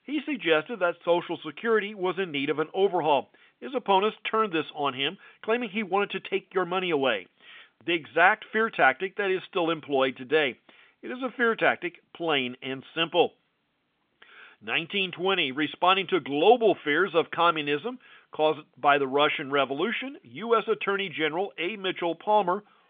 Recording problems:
phone-call audio; nothing above 3.5 kHz

